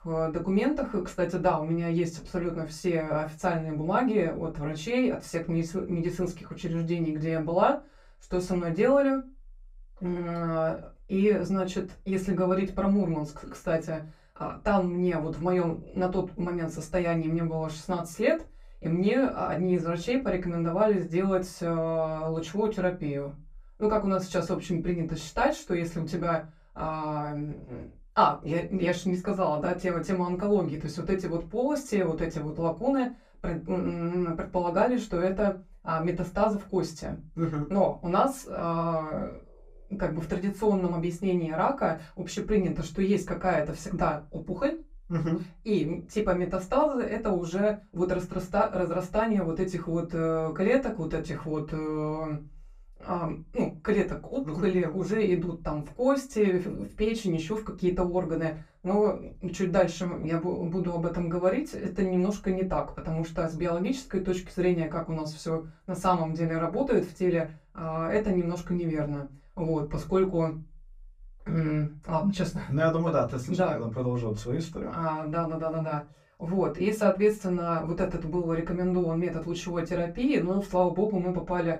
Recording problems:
off-mic speech; far
room echo; very slight; dies away in 0.2 s

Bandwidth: 15.5 kHz